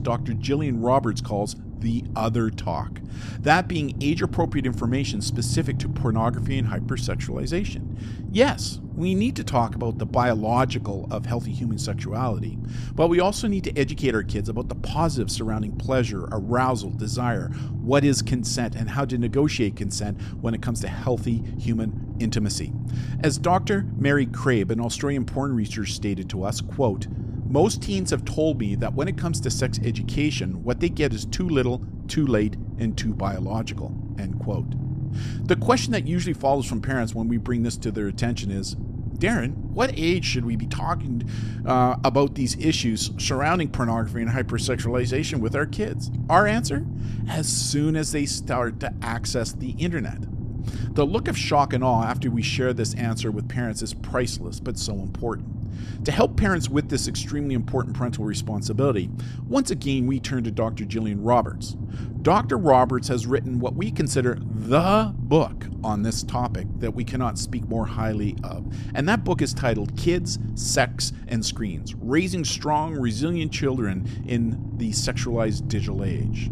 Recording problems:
low rumble; noticeable; throughout; 15 dB below the speech

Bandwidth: 14 kHz